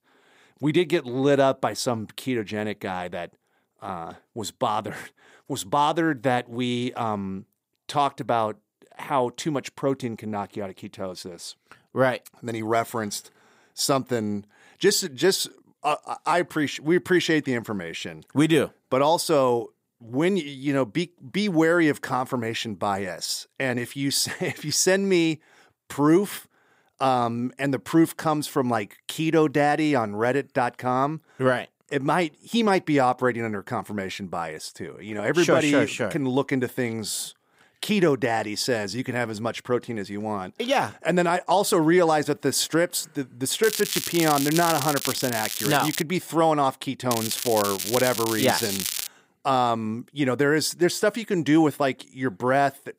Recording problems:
crackling; loud; from 44 to 46 s and from 47 to 49 s; 4 dB below the speech

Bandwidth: 15.5 kHz